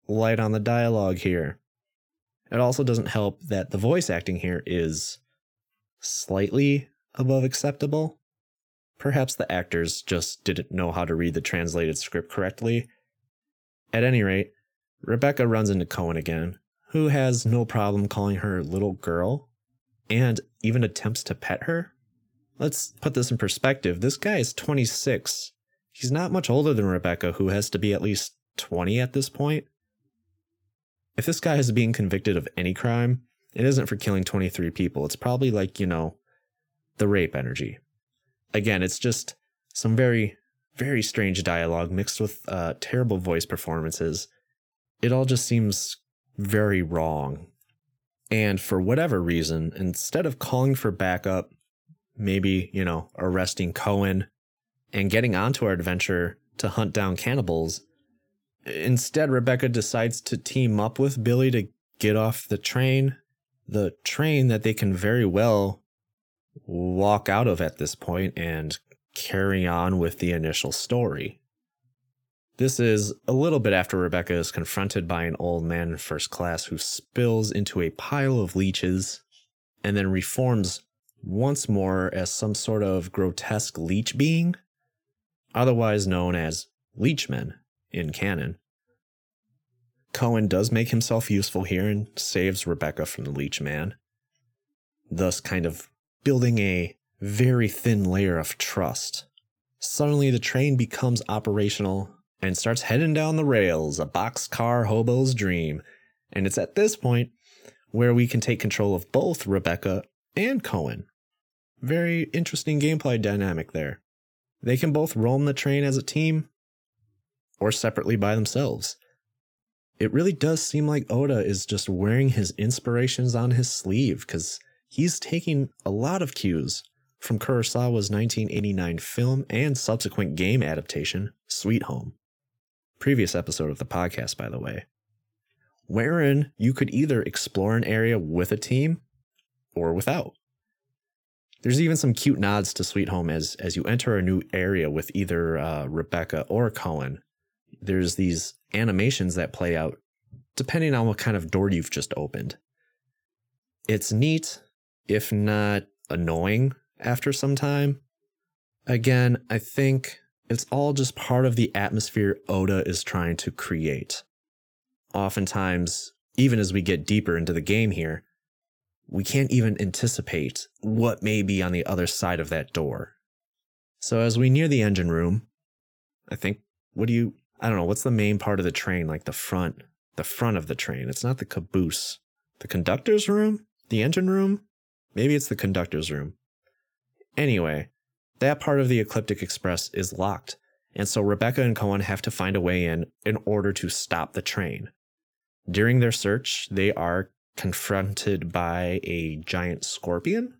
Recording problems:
none

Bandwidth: 18.5 kHz